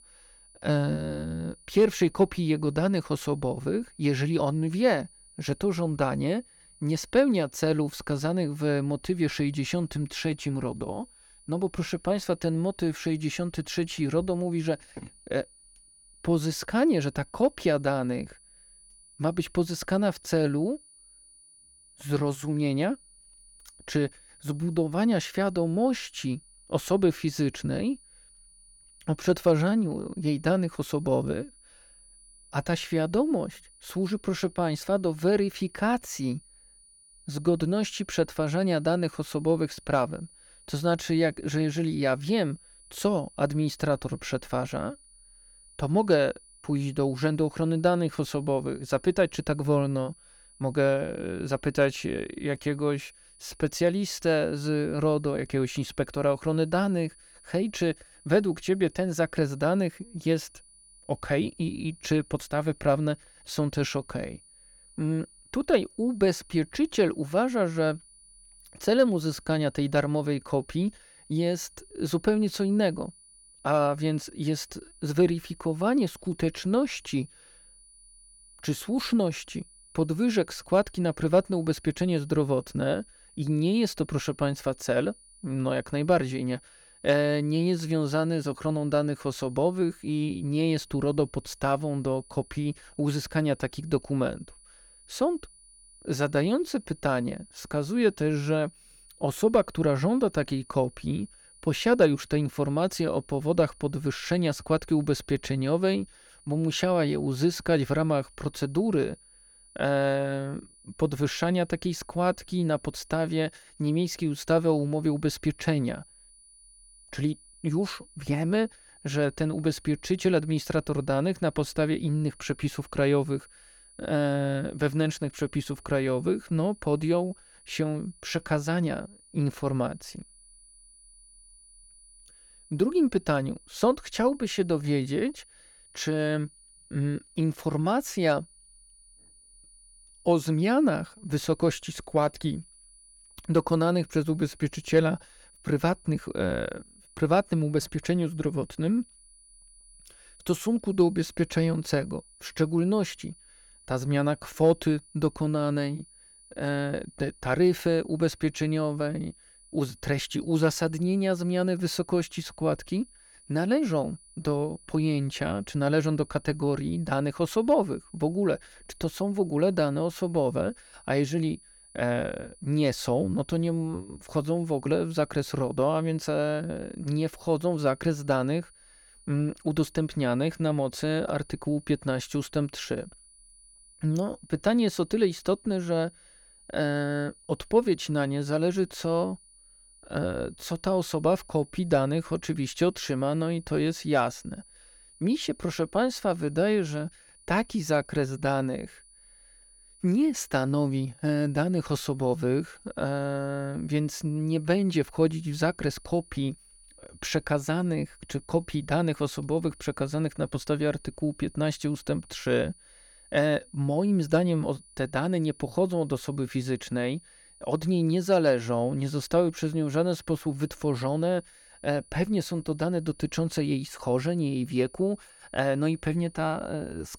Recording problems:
high-pitched whine; faint; throughout; 9.5 kHz, 25 dB below the speech

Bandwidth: 18 kHz